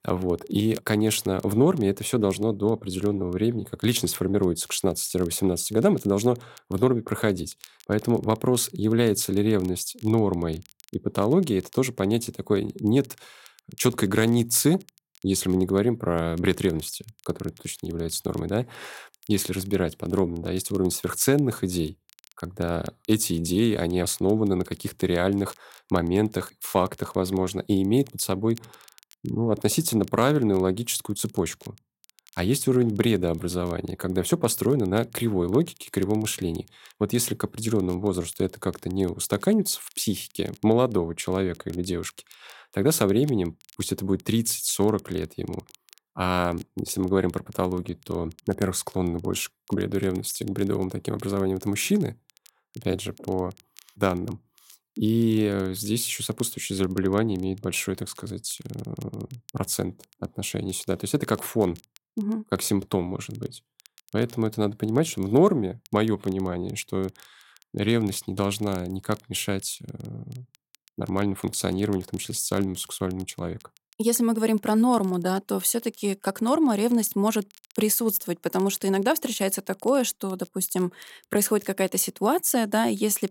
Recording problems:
crackle, like an old record; faint; 30 dB below the speech

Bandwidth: 16.5 kHz